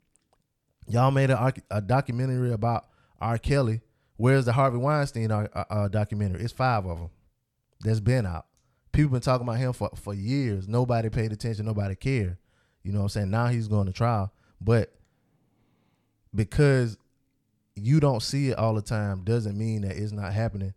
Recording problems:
none

